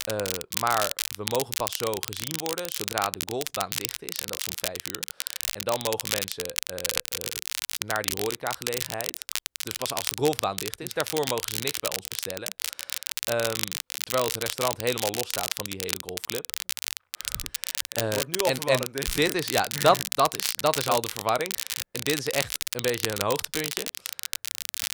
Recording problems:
crackle, like an old record; loud; 1 dB below the speech

